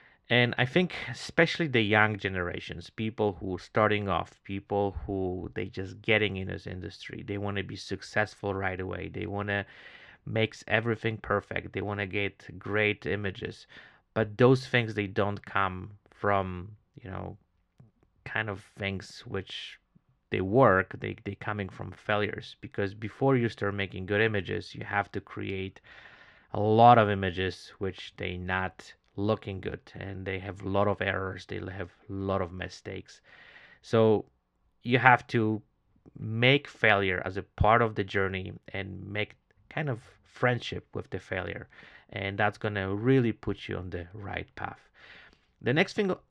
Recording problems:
muffled; slightly; fading above 3.5 kHz

